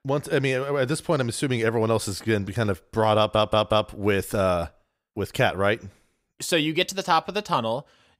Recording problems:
audio stuttering; at 3 s

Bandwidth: 15.5 kHz